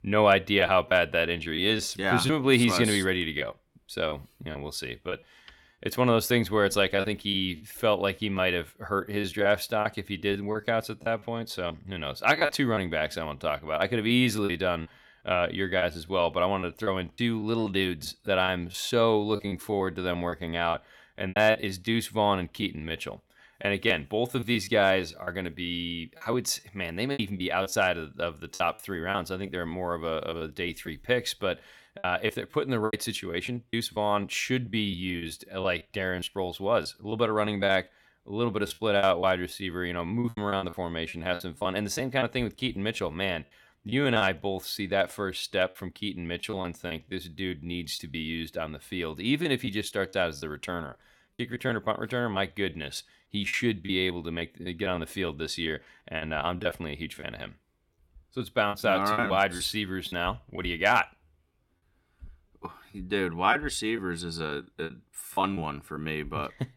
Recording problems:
choppy; very; 9% of the speech affected

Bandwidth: 17.5 kHz